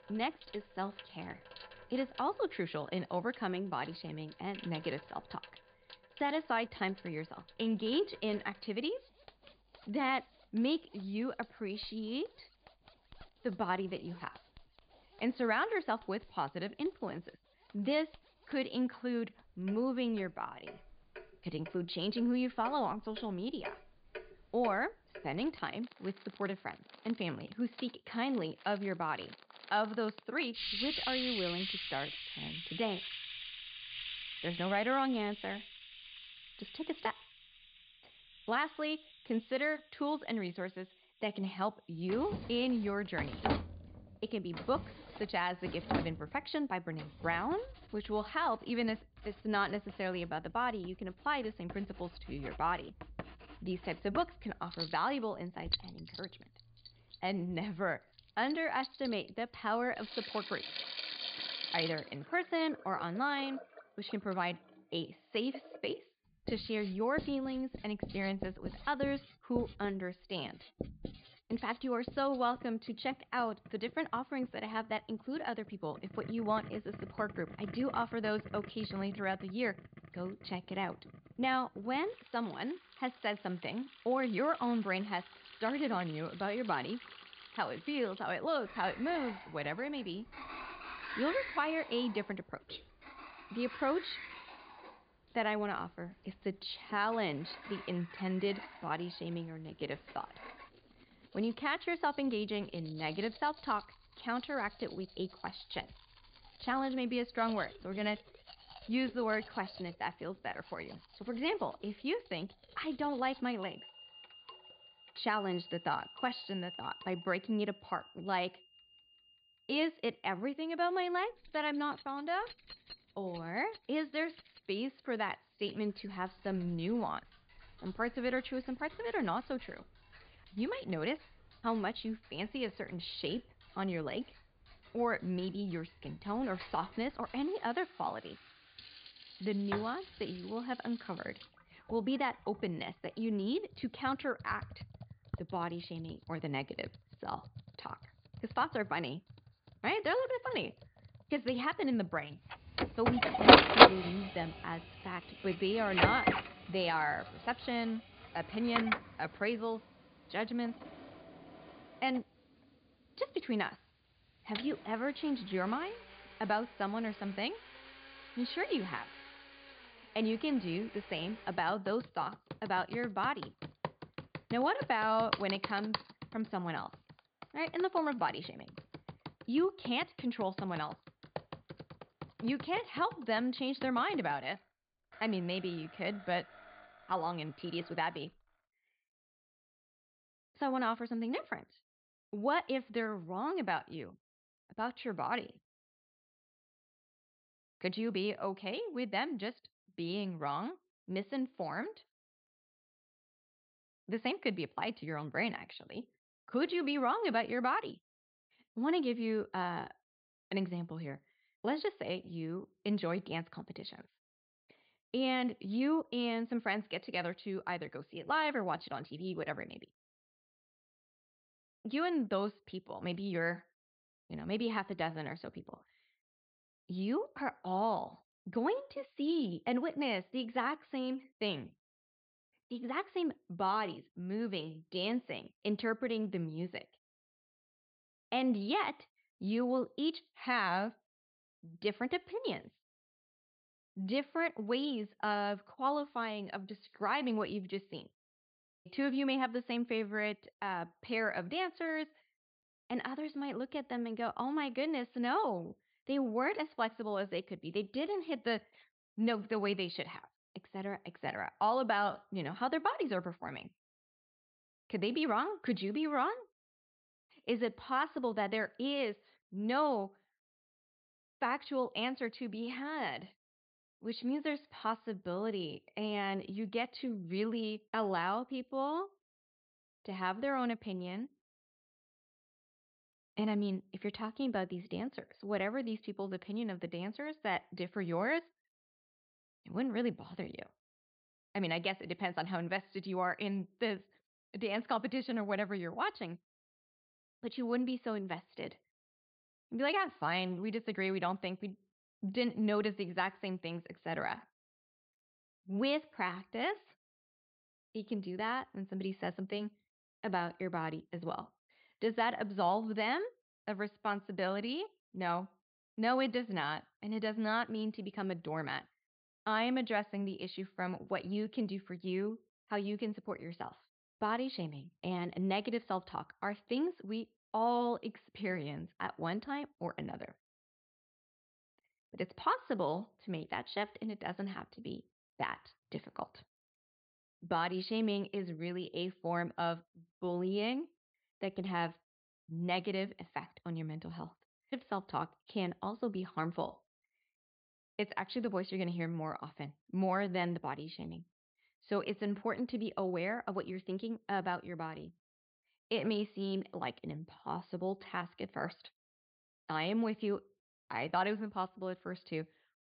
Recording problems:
high frequencies cut off; severe; nothing above 5 kHz
household noises; very loud; until 3:08; 1 dB above the speech

